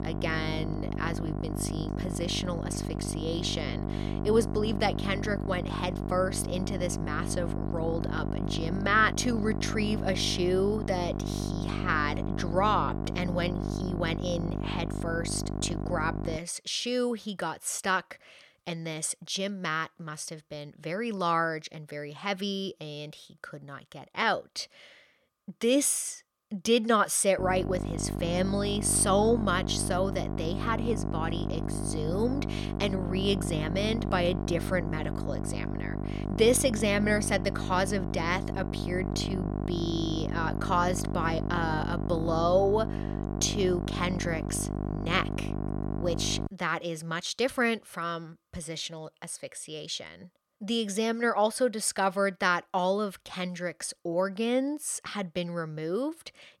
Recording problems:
electrical hum; loud; until 16 s and from 27 to 46 s; 50 Hz, 9 dB below the speech

